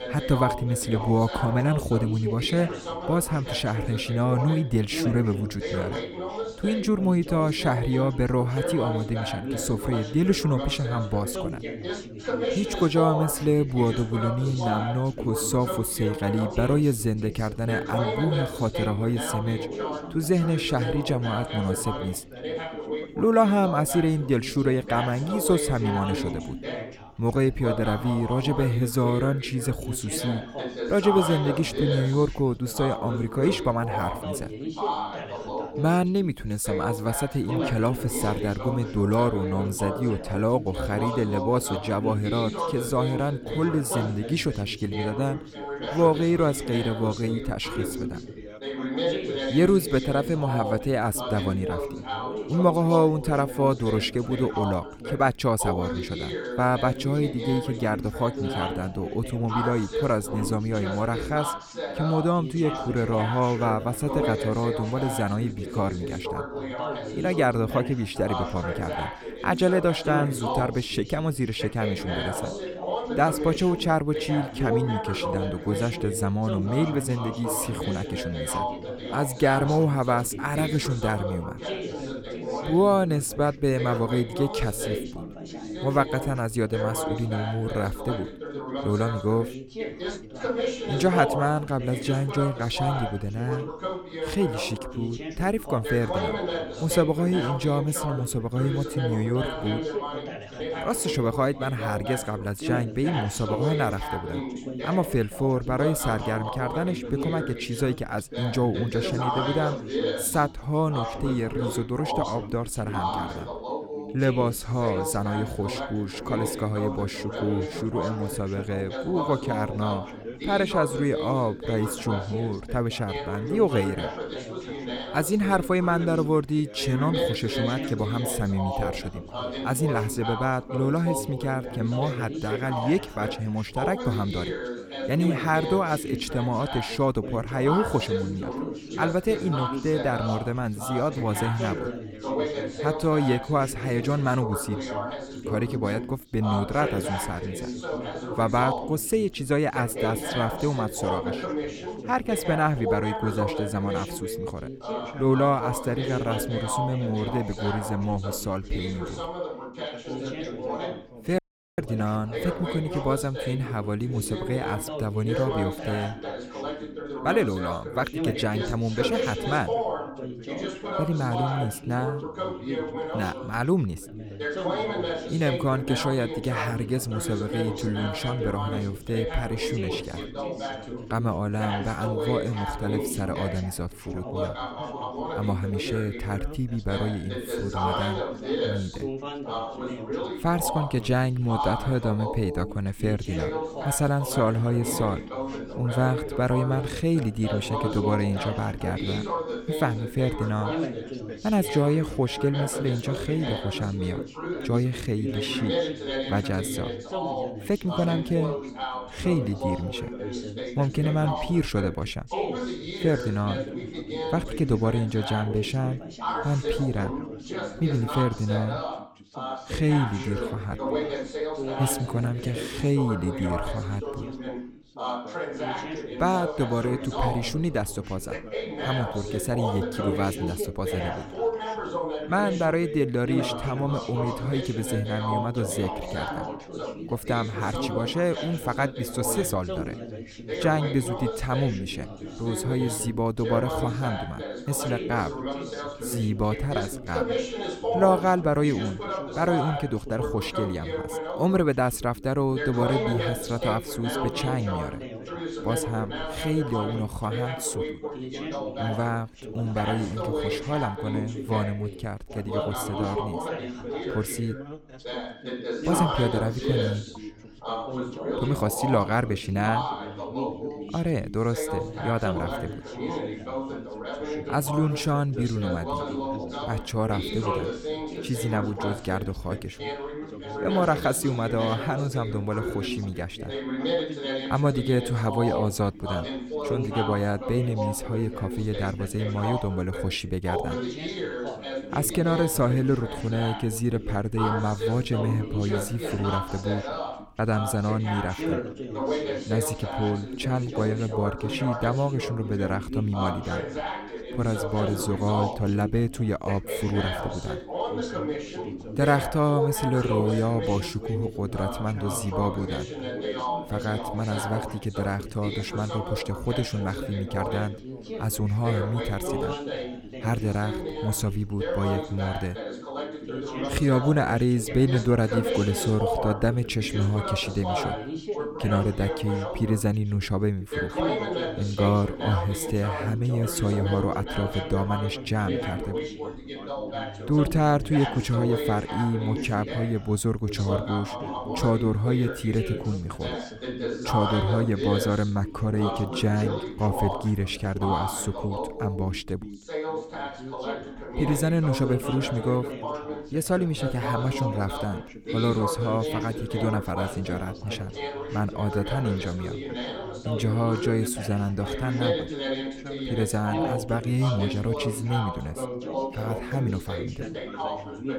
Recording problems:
background chatter; loud; throughout; 3 voices, 5 dB below the speech
audio cutting out; at 2:41

